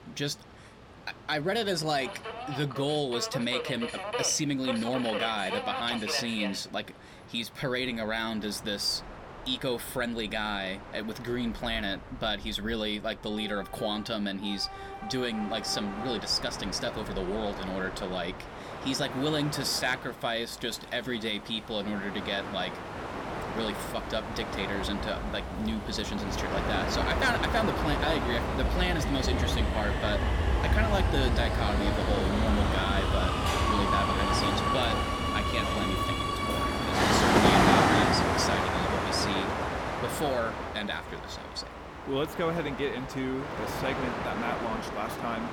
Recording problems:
train or aircraft noise; very loud; throughout; 2 dB above the speech

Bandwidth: 17.5 kHz